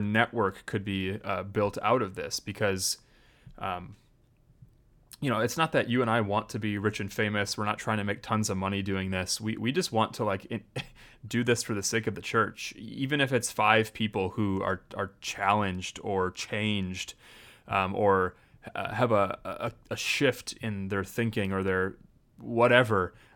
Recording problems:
abrupt cut into speech; at the start

